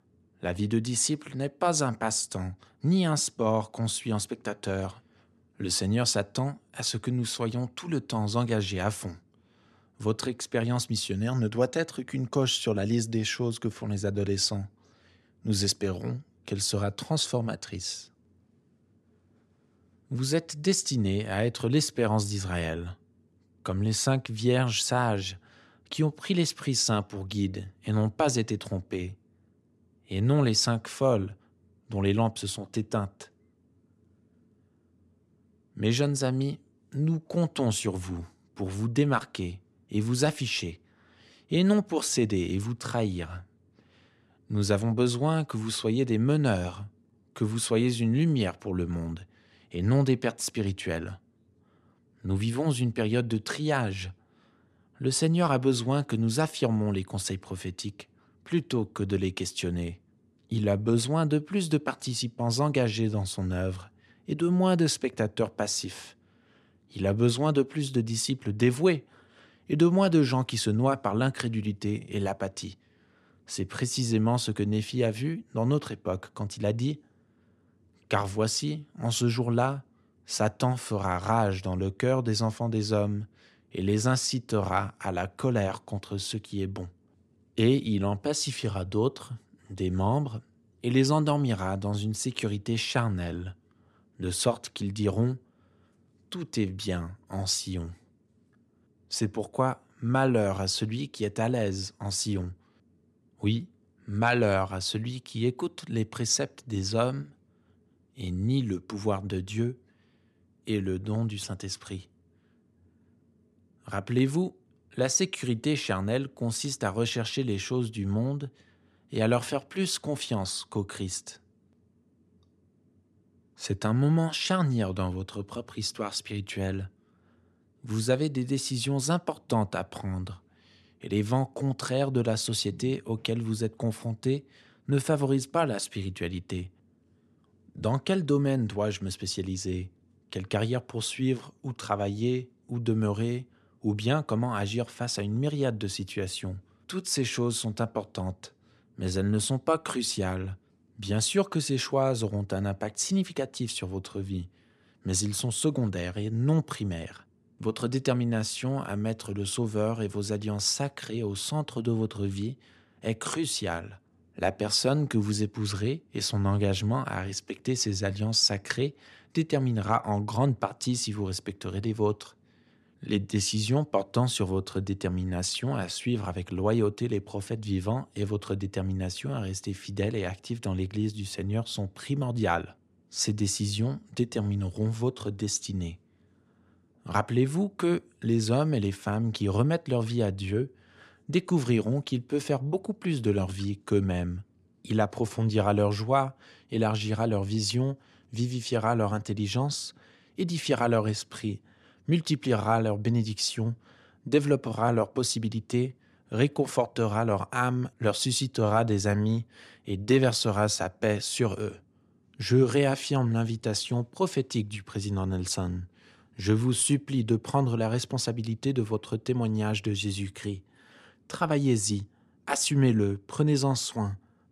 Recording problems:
none

